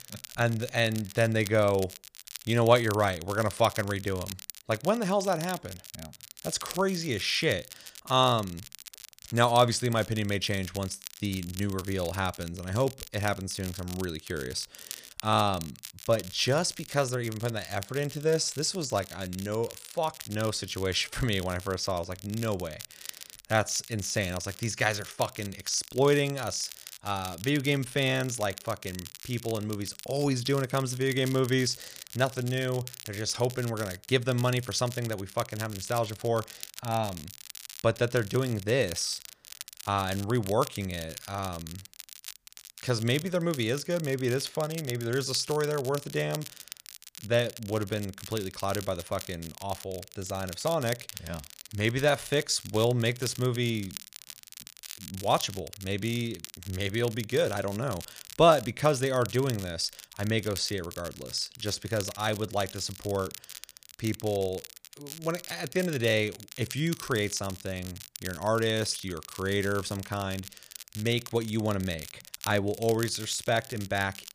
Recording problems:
crackle, like an old record; noticeable; 15 dB below the speech

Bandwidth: 15 kHz